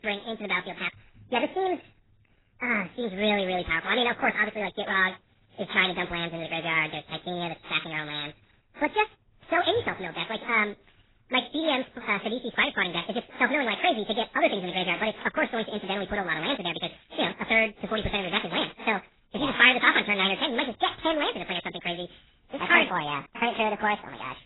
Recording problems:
garbled, watery; badly; nothing above 4 kHz
wrong speed and pitch; too fast and too high; 1.7 times normal speed

